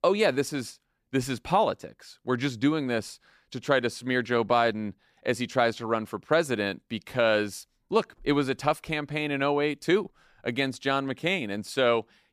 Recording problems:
none

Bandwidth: 14.5 kHz